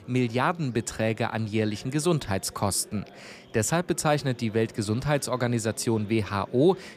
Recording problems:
murmuring crowd; faint; throughout; 20 dB below the speech

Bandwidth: 14.5 kHz